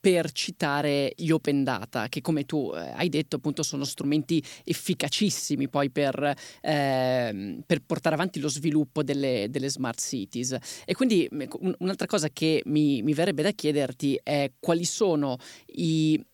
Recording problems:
none

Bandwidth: 18.5 kHz